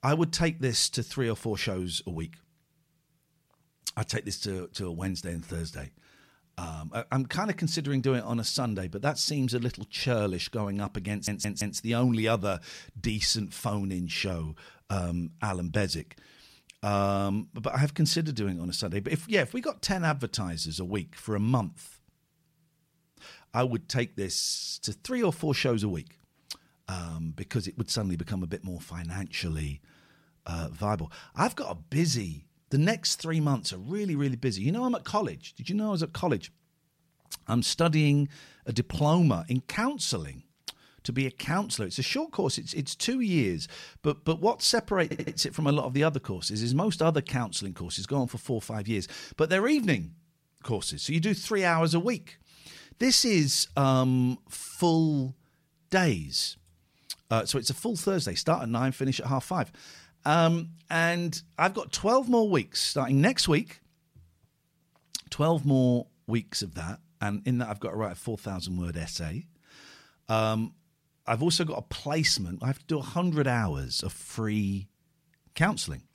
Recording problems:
audio stuttering; at 11 s and at 45 s

